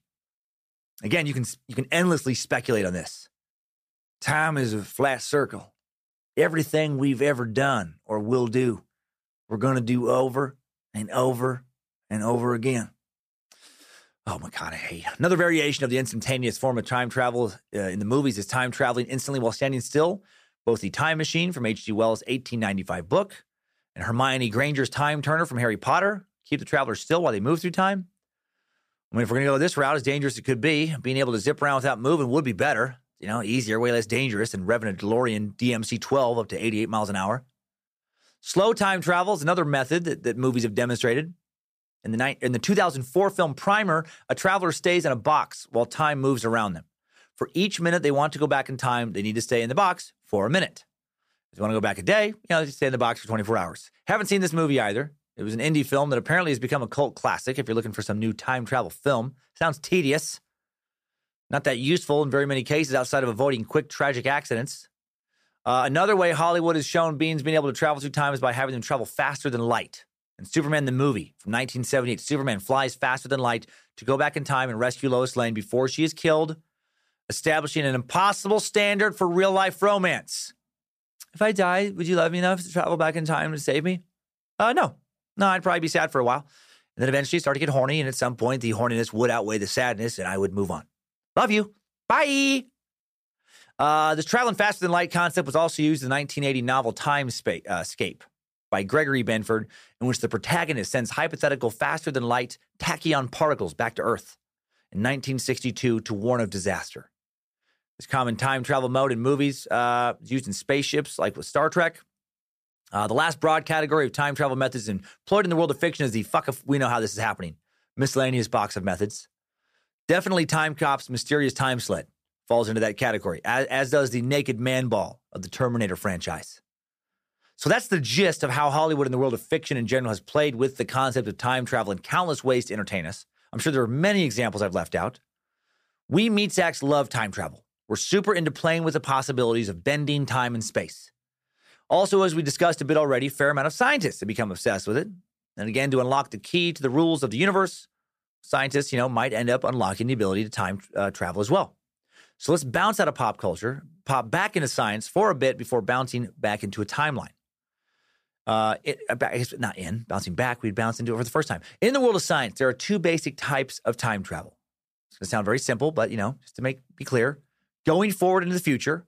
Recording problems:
none

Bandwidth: 15 kHz